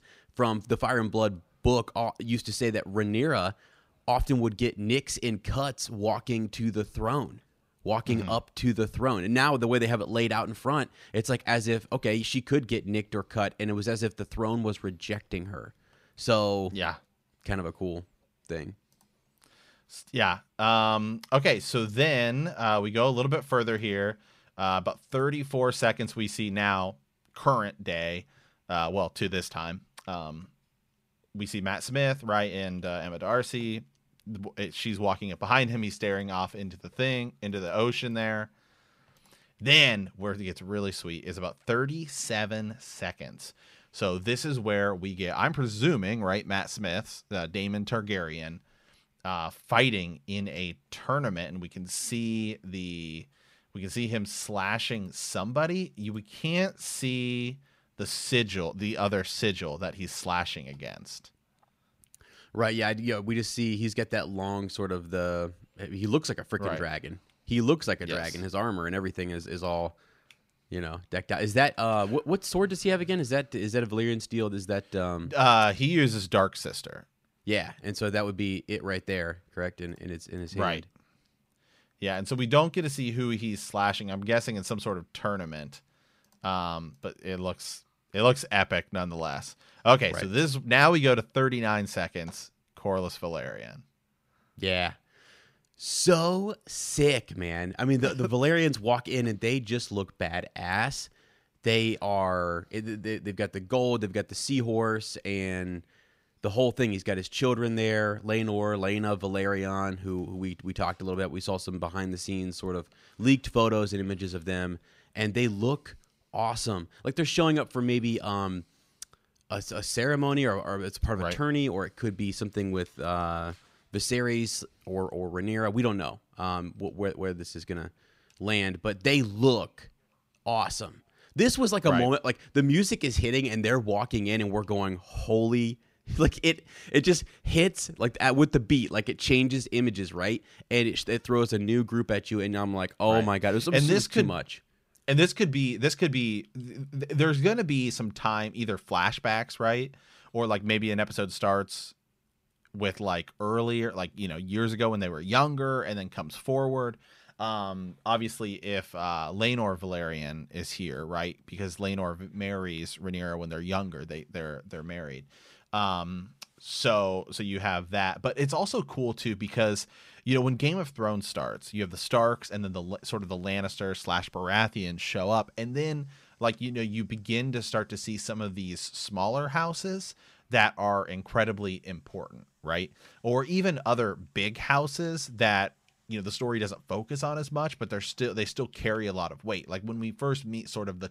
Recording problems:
none

